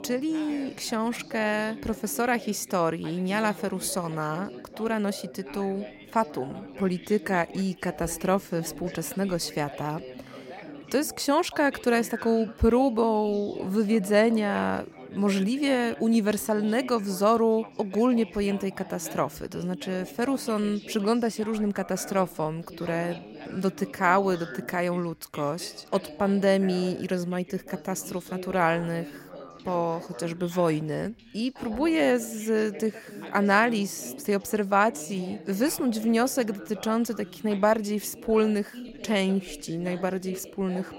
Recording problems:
background chatter; noticeable; throughout; 3 voices, 15 dB below the speech

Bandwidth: 16 kHz